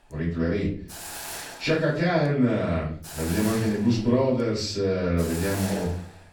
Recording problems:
off-mic speech; far
room echo; slight; dies away in 0.4 s
hiss; noticeable; throughout; 10 dB below the speech

